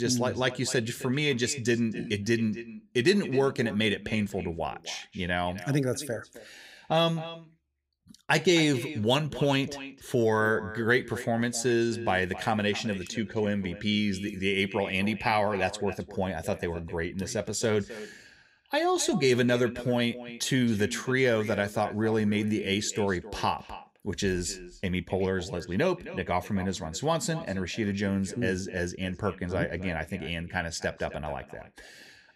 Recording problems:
echo of what is said; noticeable; throughout; 260 ms later, 15 dB below the speech
abrupt cut into speech; at the start

